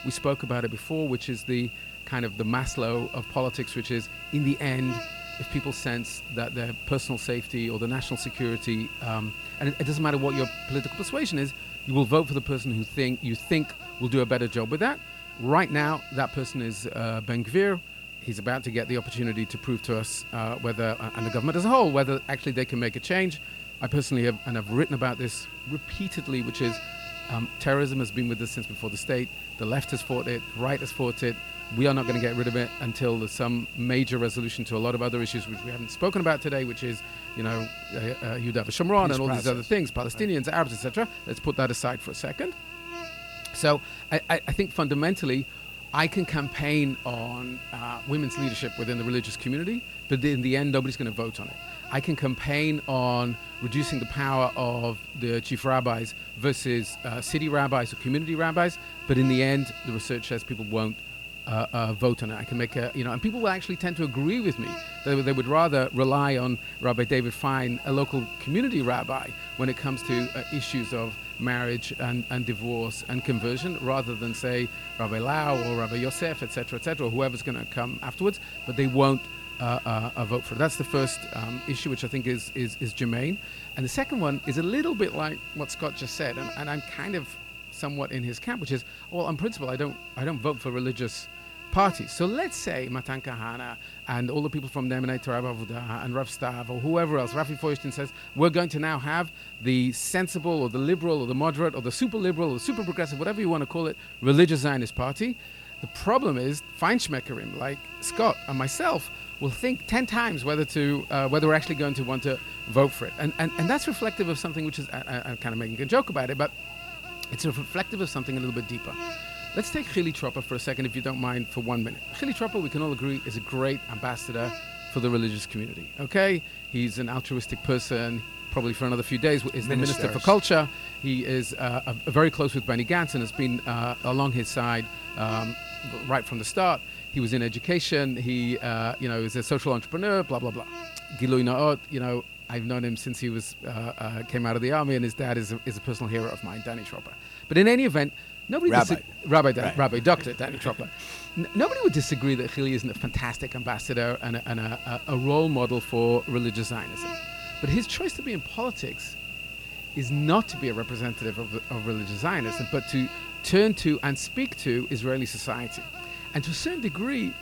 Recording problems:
electrical hum; loud; throughout; 60 Hz, 7 dB below the speech

